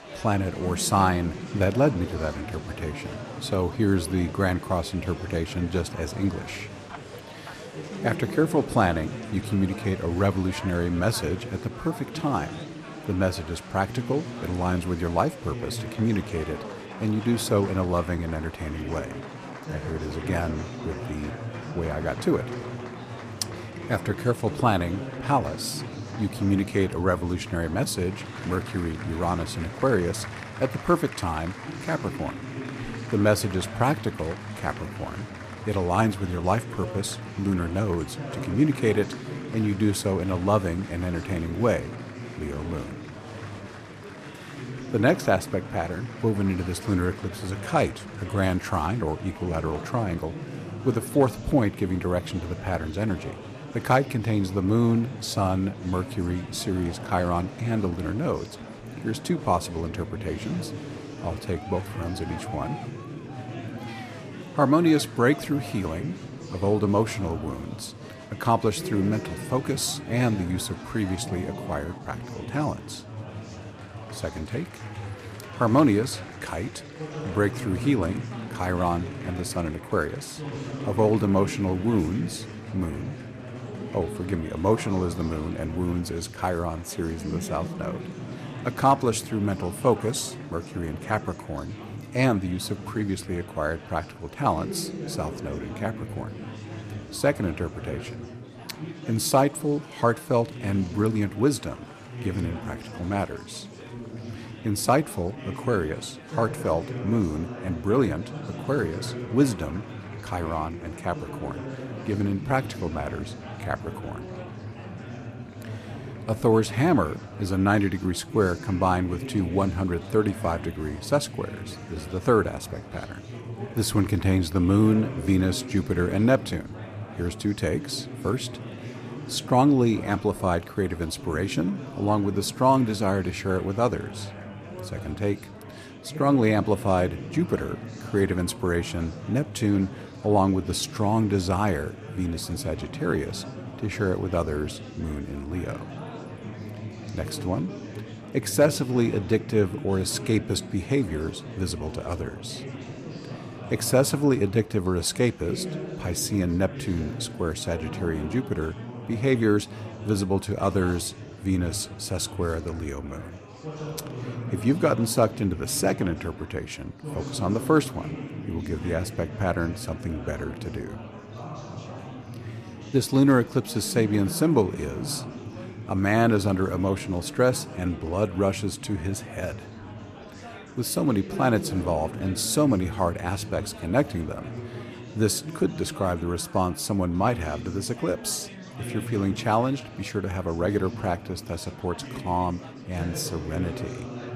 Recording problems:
murmuring crowd; noticeable; throughout; 10 dB below the speech

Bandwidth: 14.5 kHz